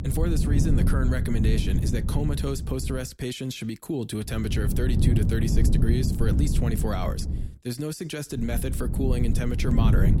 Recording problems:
low rumble; loud; until 3 s, from 4.5 to 7.5 s and from 8.5 s on; 4 dB below the speech

